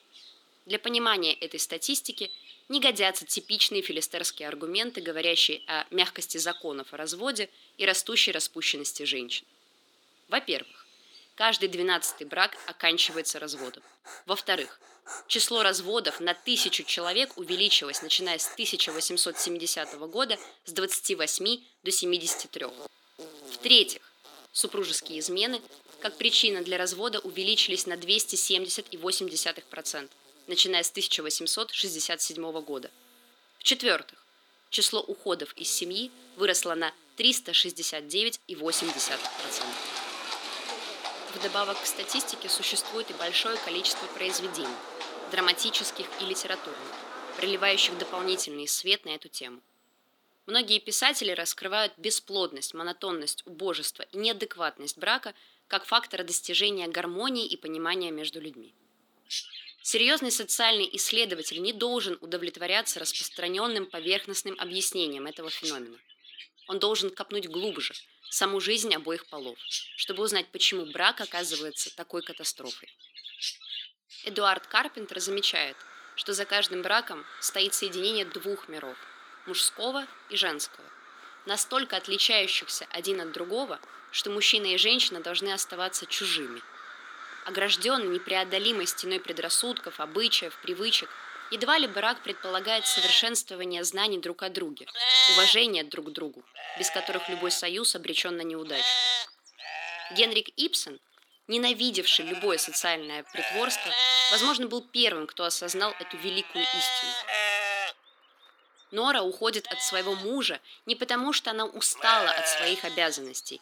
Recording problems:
thin; somewhat; fading below 300 Hz
animal sounds; loud; throughout; 4 dB below the speech

